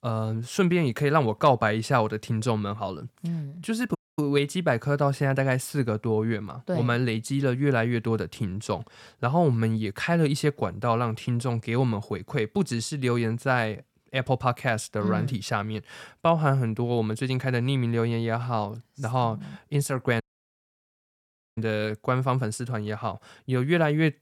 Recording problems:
audio cutting out; at 4 s and at 20 s for 1.5 s

